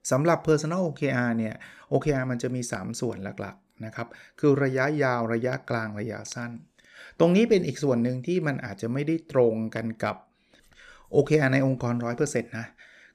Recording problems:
none

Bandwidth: 14.5 kHz